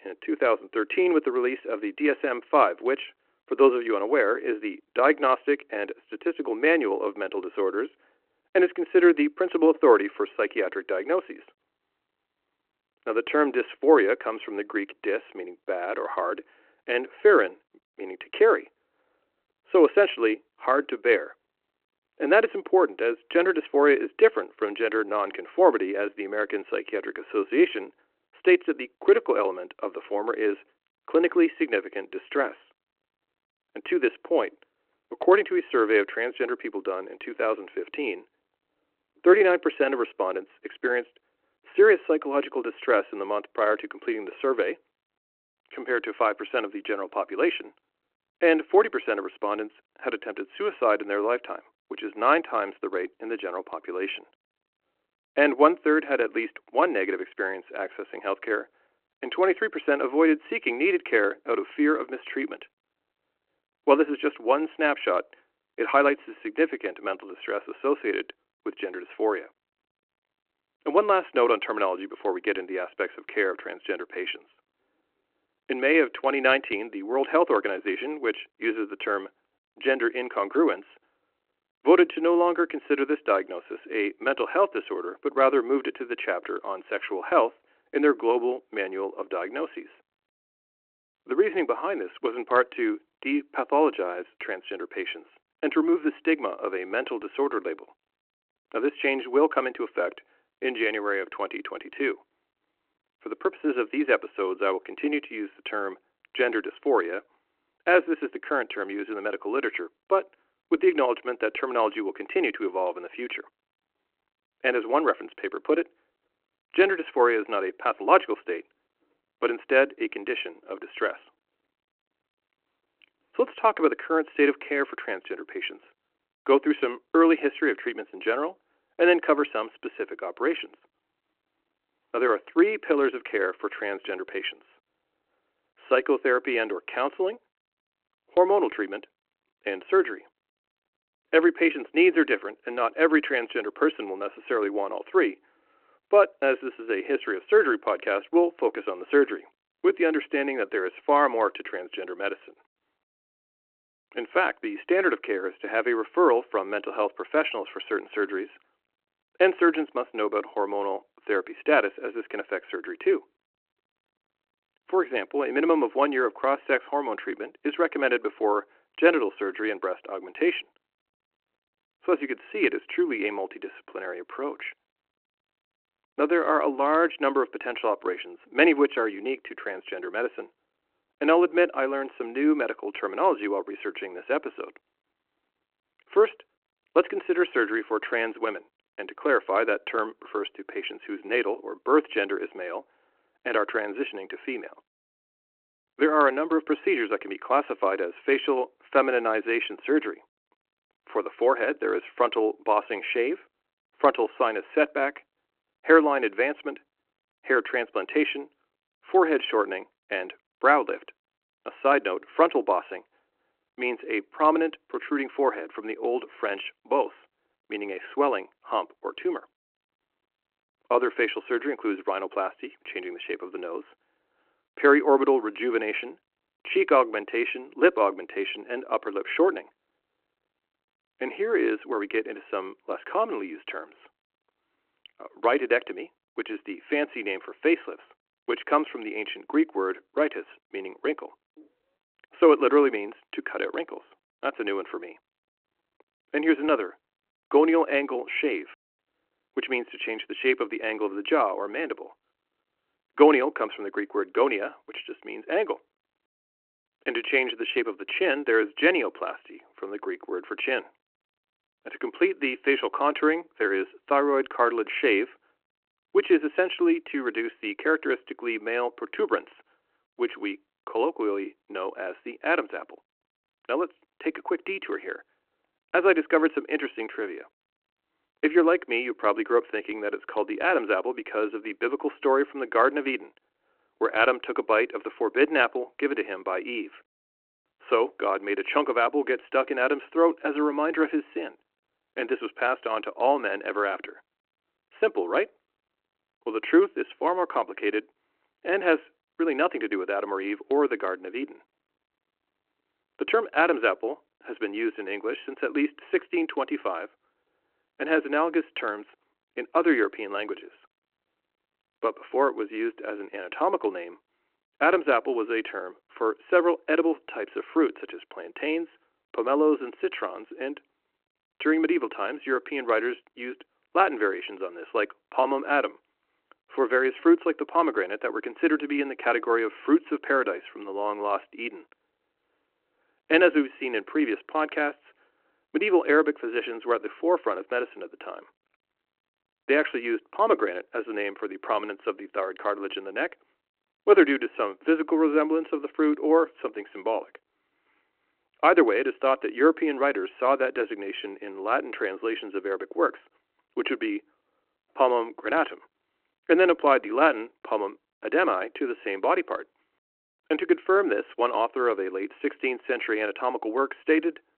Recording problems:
phone-call audio

